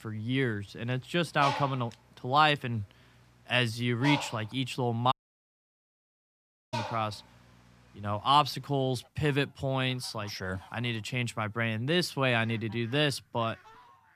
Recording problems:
animal sounds; noticeable; throughout; 10 dB below the speech
audio cutting out; at 5 s for 1.5 s

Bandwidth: 14.5 kHz